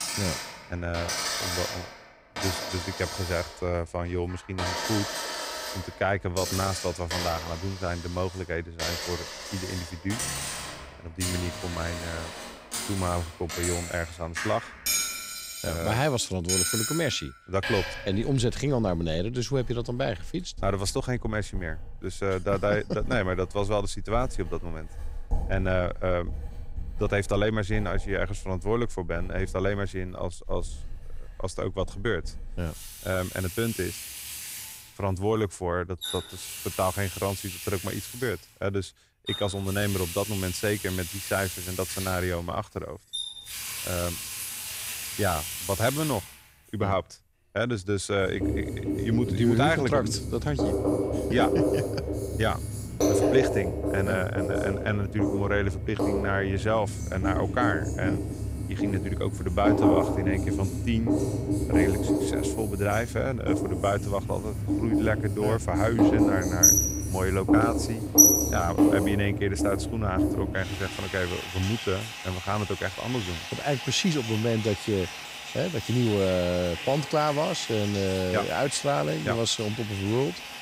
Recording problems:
household noises; very loud; throughout; as loud as the speech

